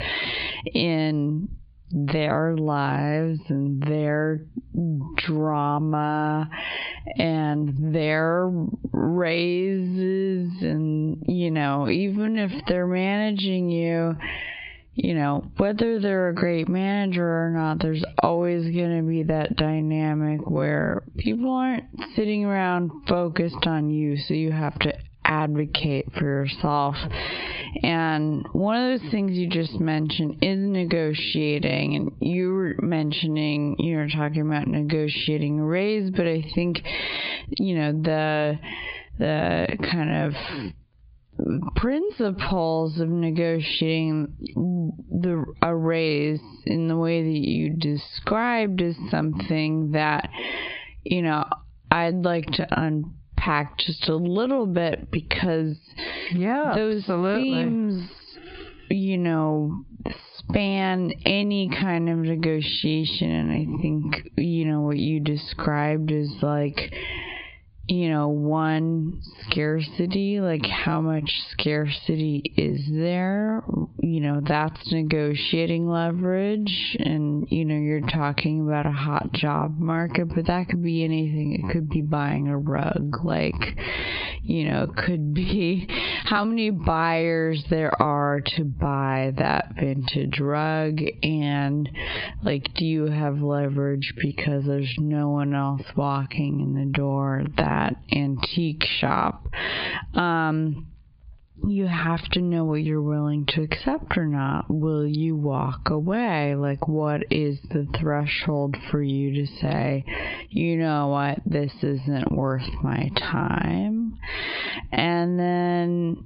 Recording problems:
high frequencies cut off; severe; nothing above 4.5 kHz
squashed, flat; heavily
wrong speed, natural pitch; too slow; 0.6 times normal speed

